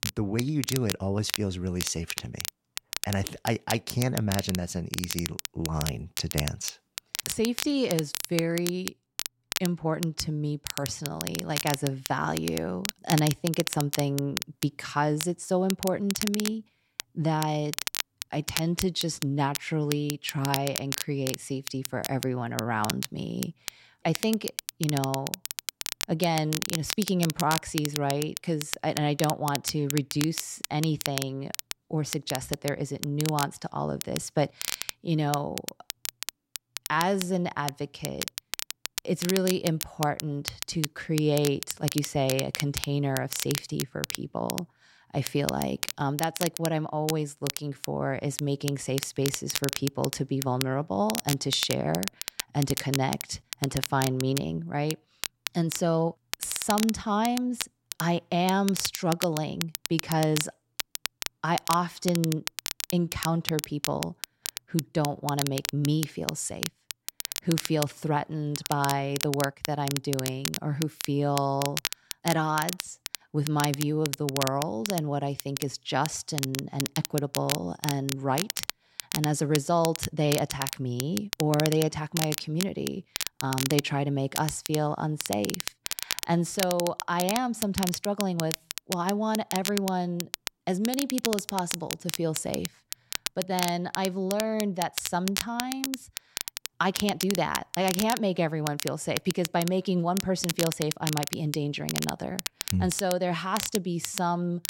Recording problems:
crackle, like an old record; loud; 5 dB below the speech

